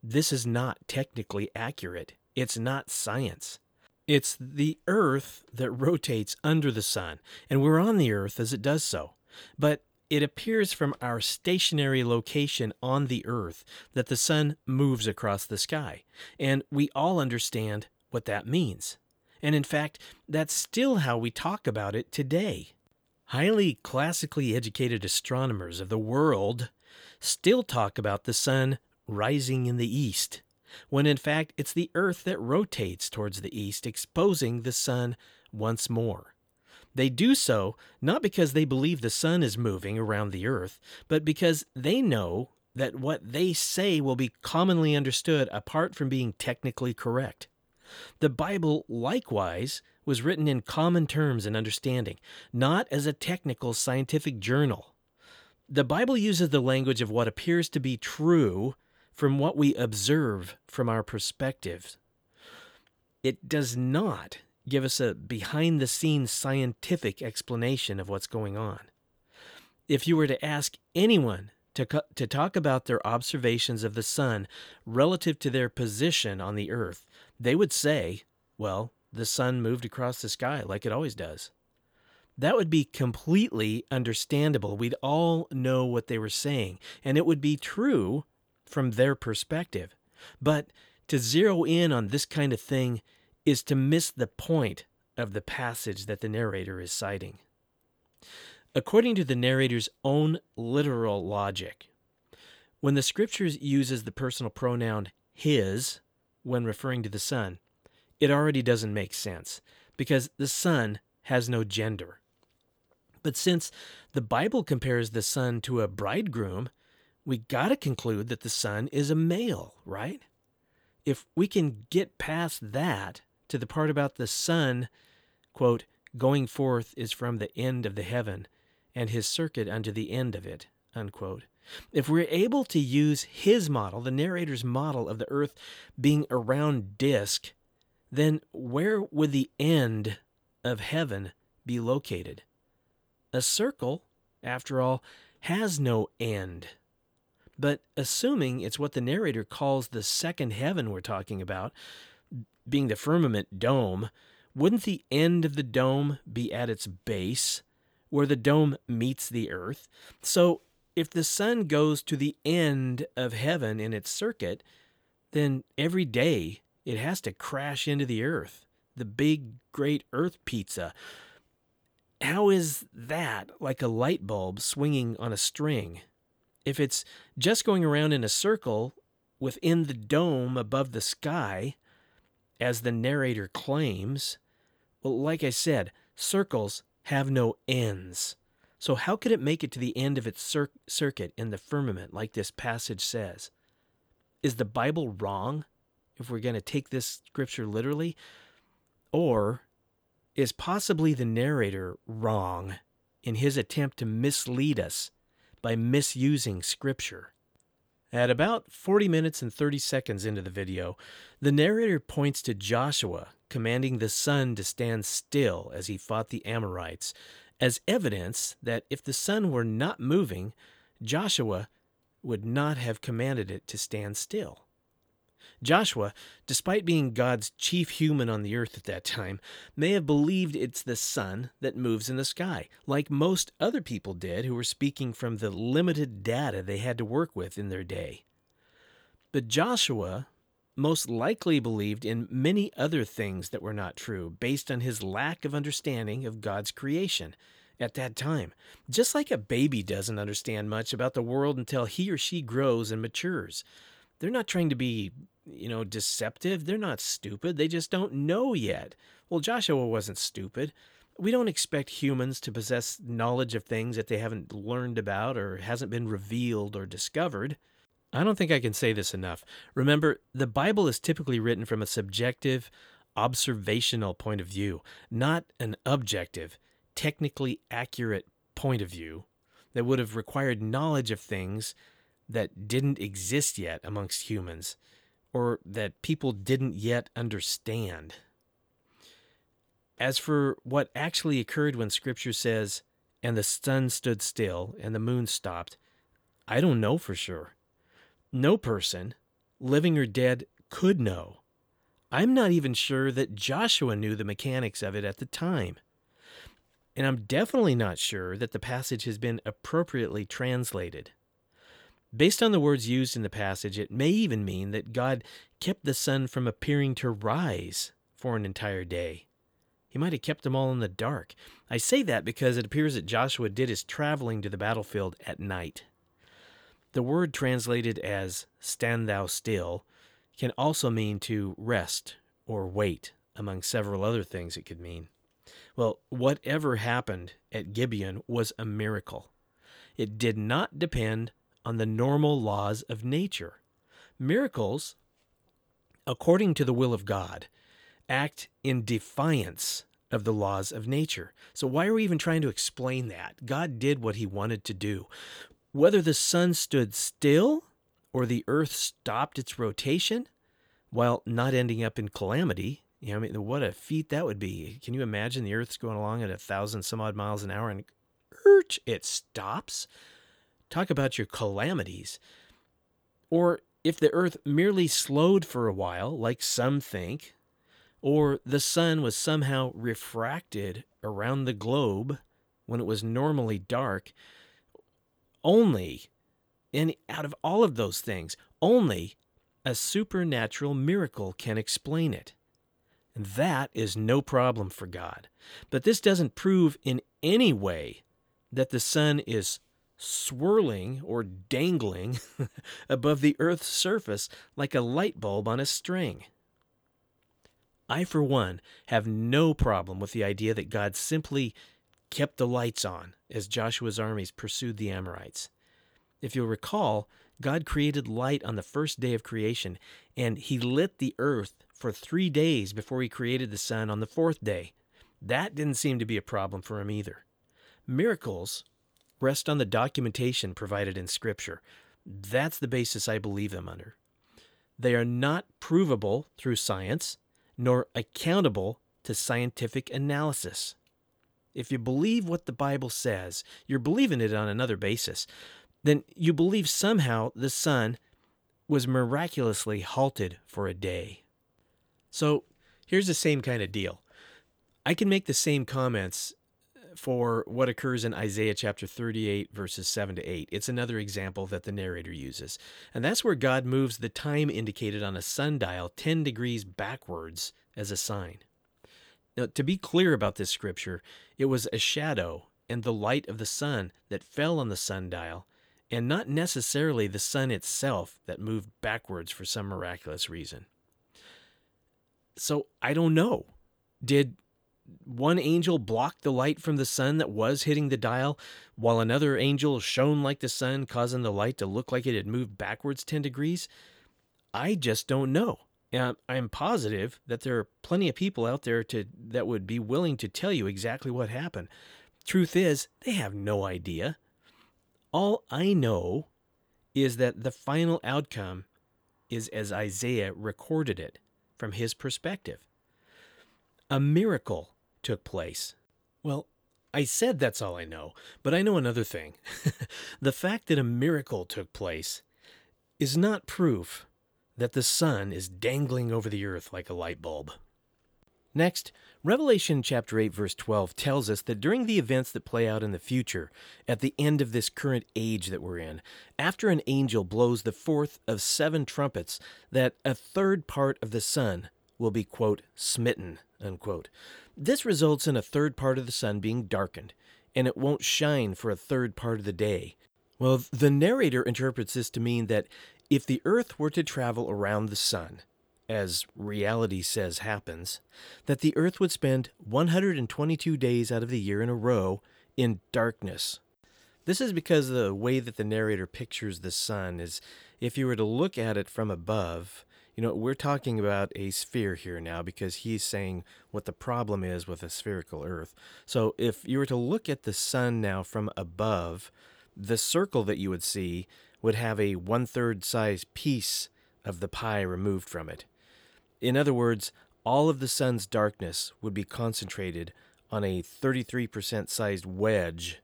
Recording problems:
none

